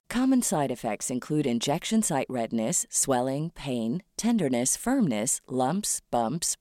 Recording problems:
none

